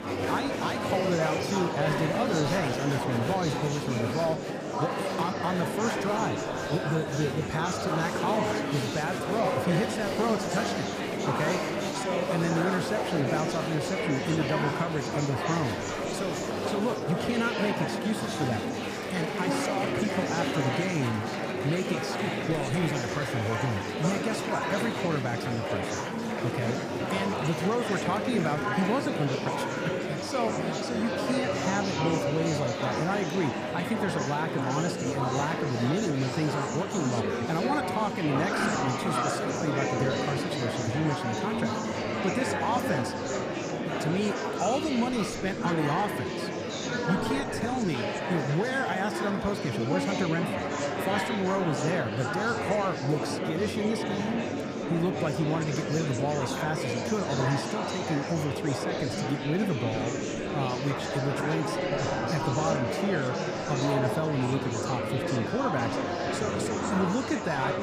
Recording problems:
murmuring crowd; very loud; throughout; 1 dB above the speech

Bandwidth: 15 kHz